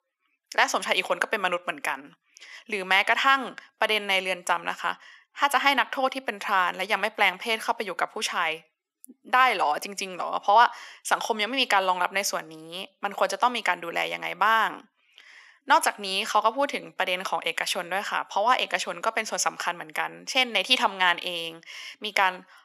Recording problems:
thin; very; fading below 700 Hz

